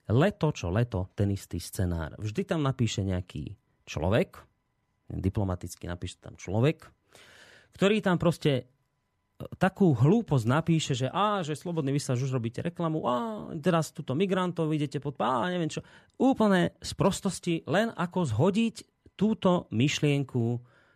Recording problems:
none

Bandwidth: 14.5 kHz